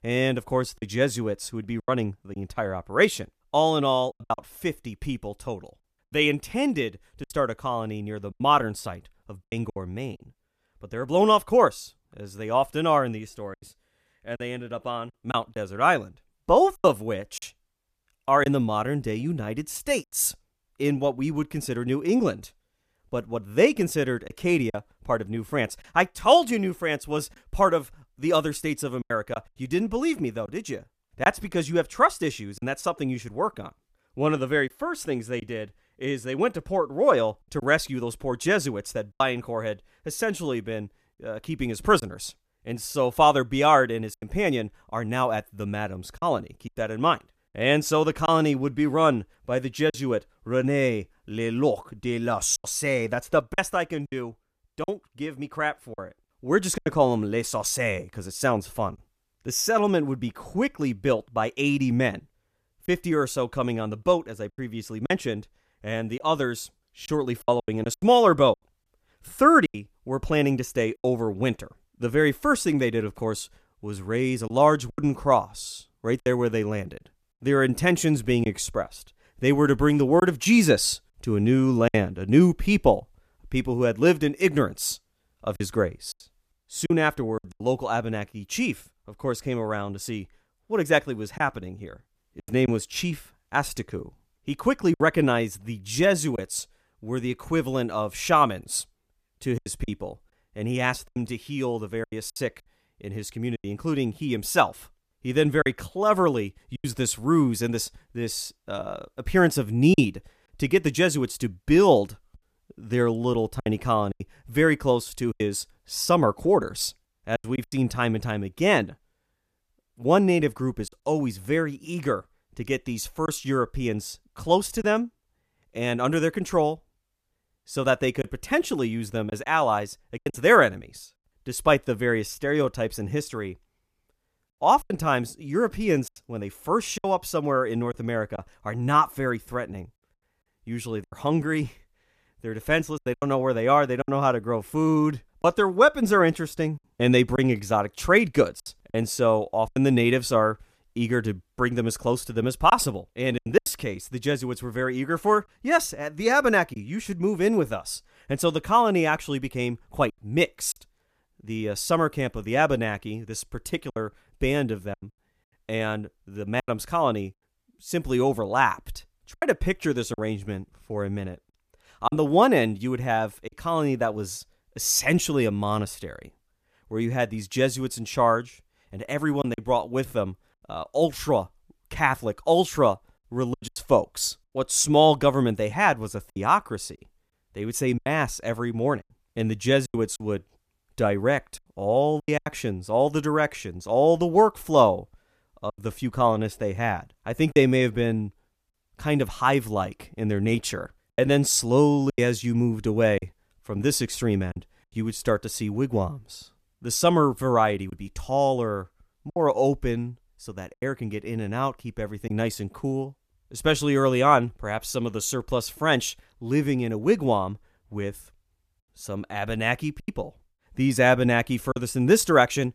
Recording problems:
choppy; occasionally; 4% of the speech affected

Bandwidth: 14.5 kHz